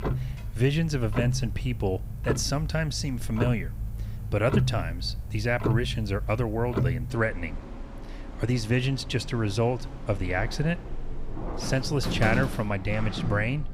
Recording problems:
household noises; loud; throughout; 5 dB below the speech

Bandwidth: 15.5 kHz